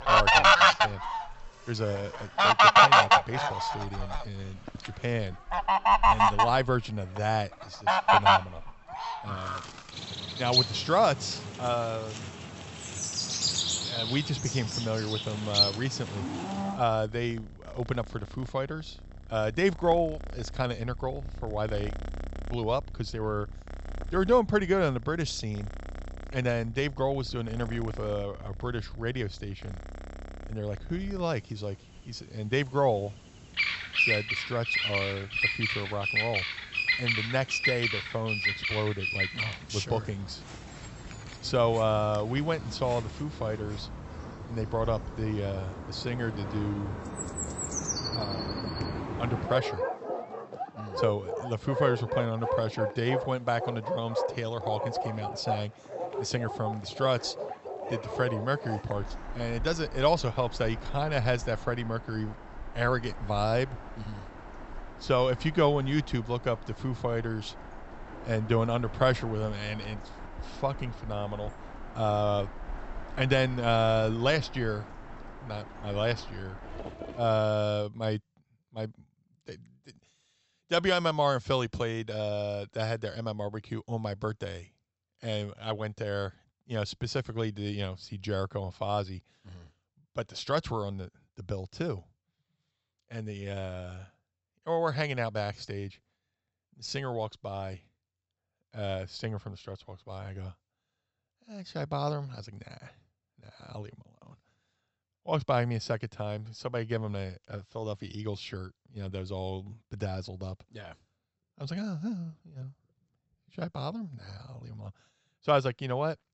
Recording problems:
high frequencies cut off; noticeable; nothing above 8 kHz
animal sounds; very loud; until 1:17; 4 dB above the speech

